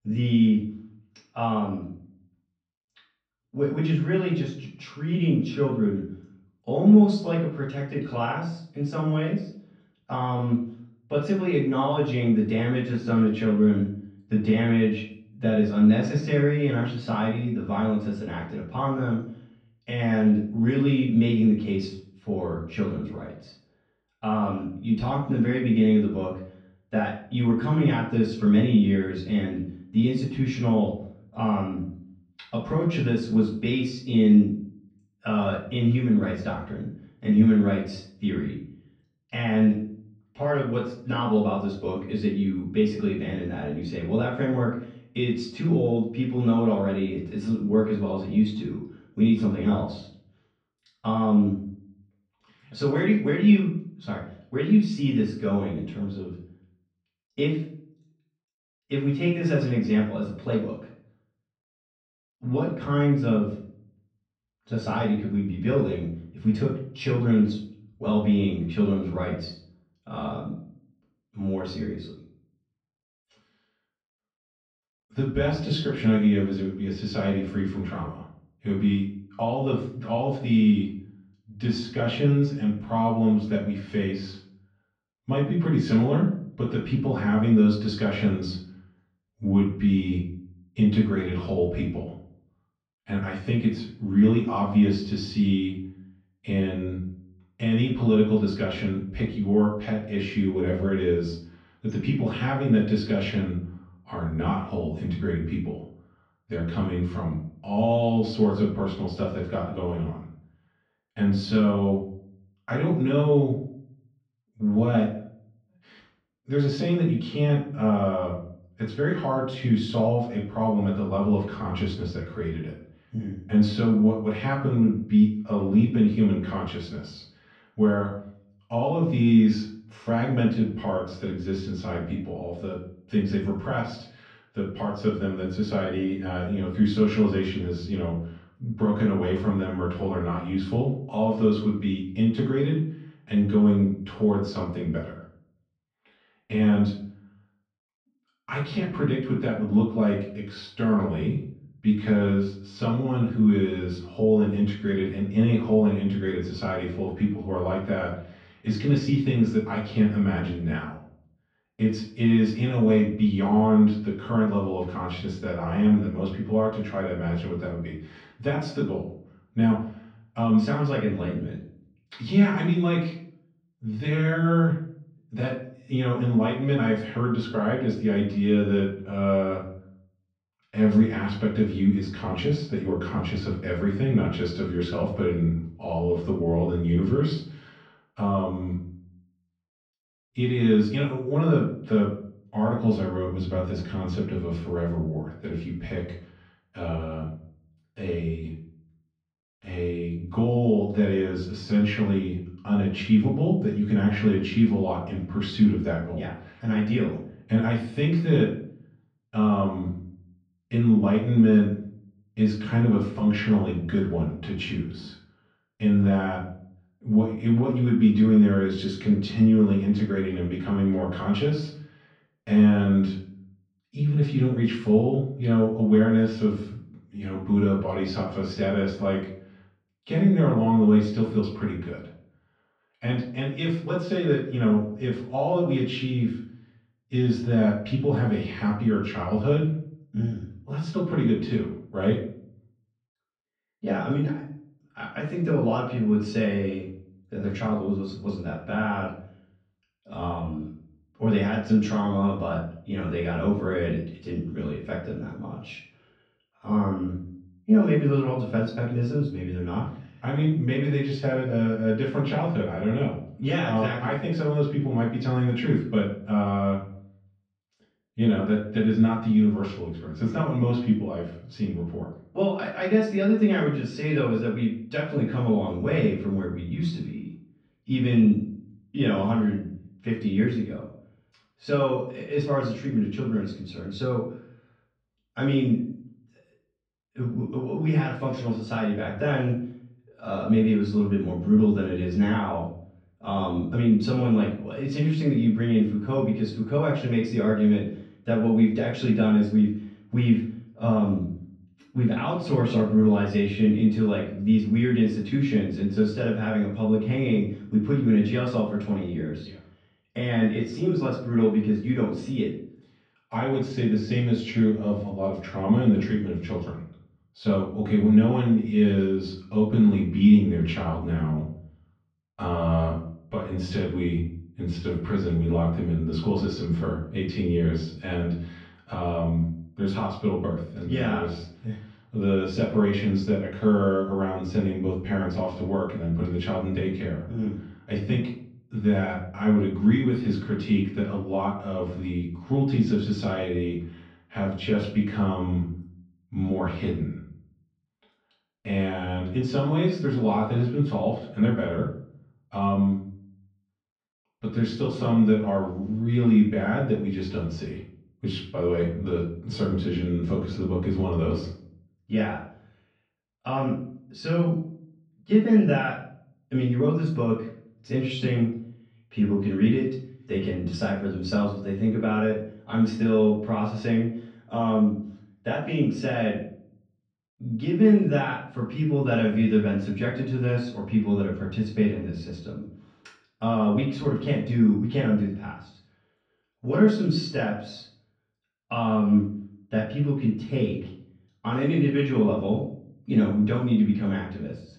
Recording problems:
off-mic speech; far
room echo; noticeable; dies away in 0.5 s
muffled; very slightly; fading above 4 kHz

